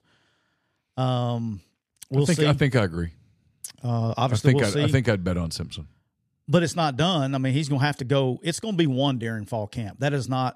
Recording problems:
none

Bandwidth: 14.5 kHz